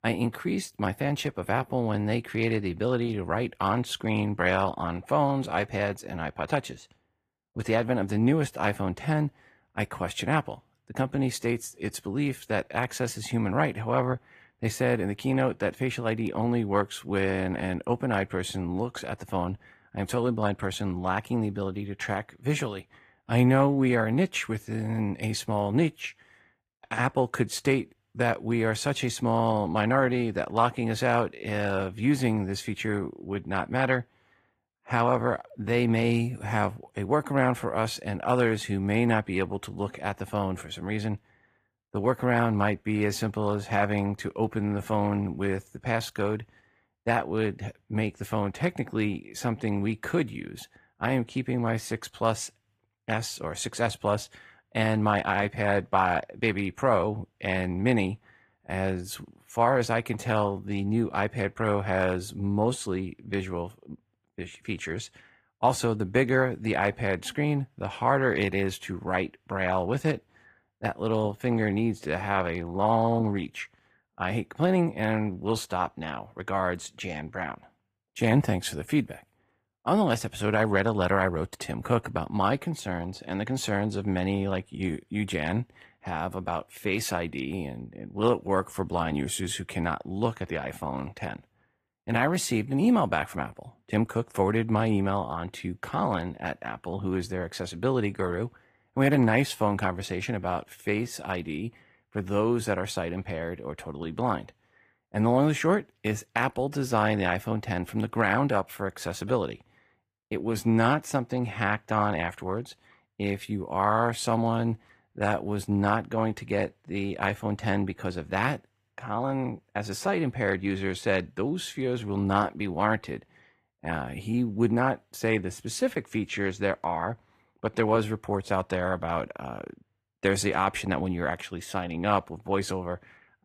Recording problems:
garbled, watery; slightly; nothing above 15 kHz

